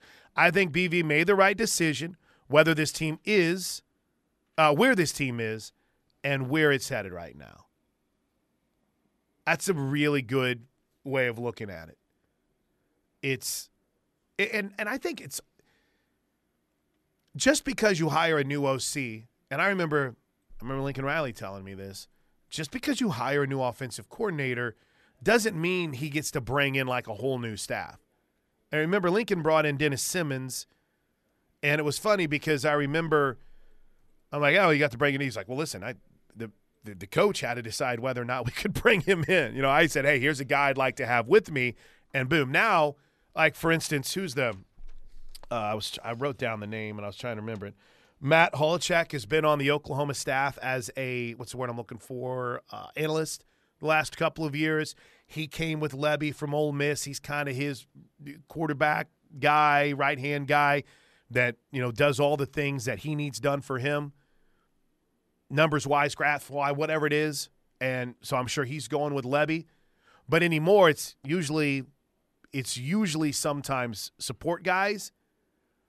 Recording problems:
none

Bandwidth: 13.5 kHz